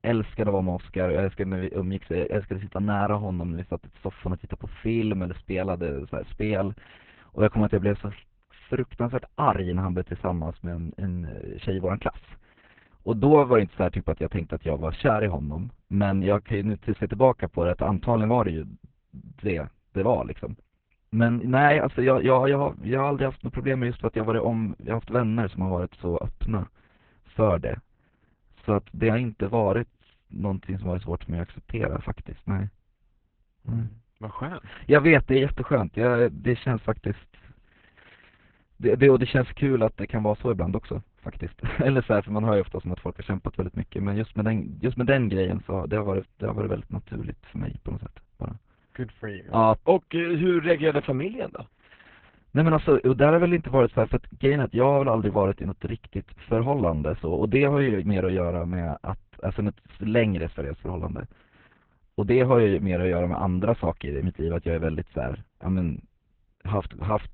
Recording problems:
garbled, watery; badly; nothing above 4 kHz
muffled; very slightly; fading above 3 kHz

